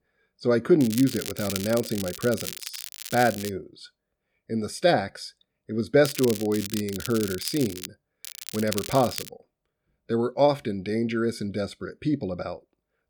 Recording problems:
crackling; loud; from 1 to 3.5 s, from 6 to 8 s and from 8 to 9.5 s; 9 dB below the speech

